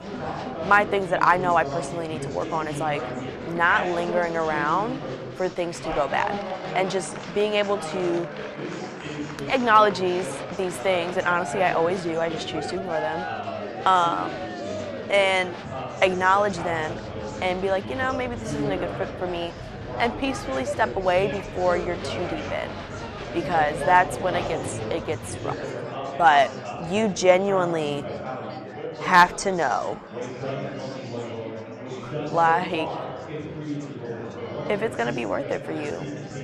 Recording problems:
murmuring crowd; loud; throughout; 9 dB below the speech

